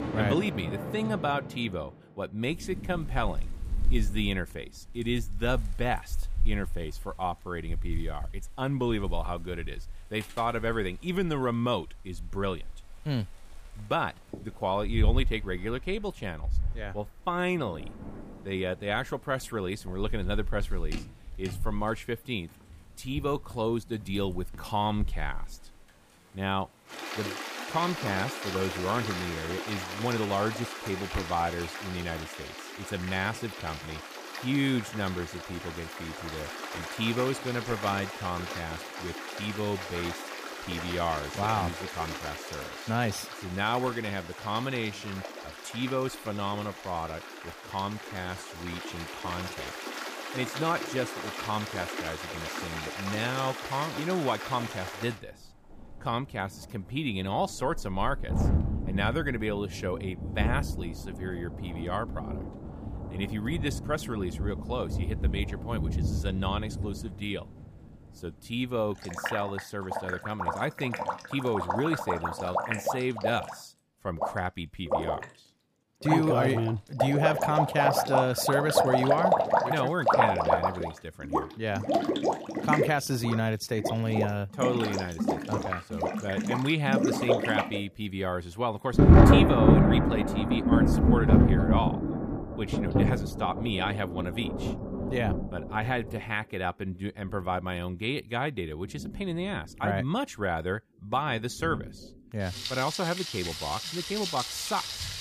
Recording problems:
rain or running water; very loud; throughout; 1 dB above the speech

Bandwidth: 15 kHz